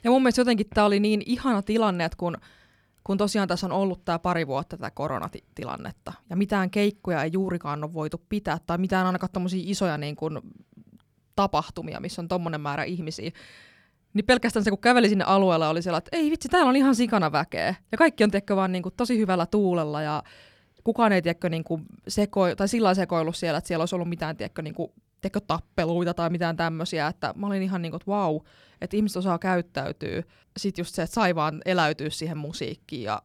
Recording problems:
none

